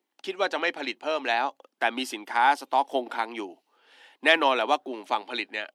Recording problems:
thin; somewhat; fading below 250 Hz

